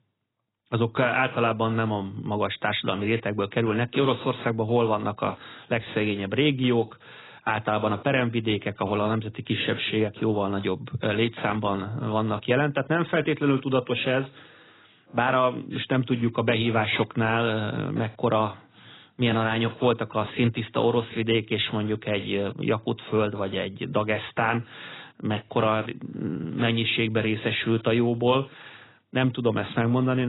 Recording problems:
garbled, watery; badly; nothing above 4 kHz
abrupt cut into speech; at the end

